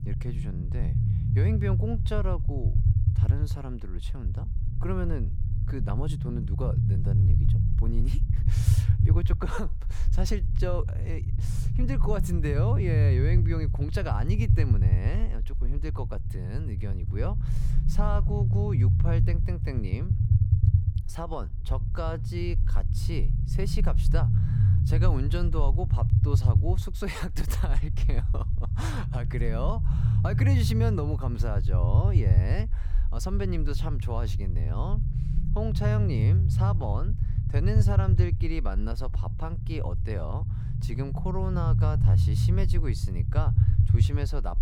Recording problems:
low rumble; loud; throughout; 3 dB below the speech

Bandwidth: 17.5 kHz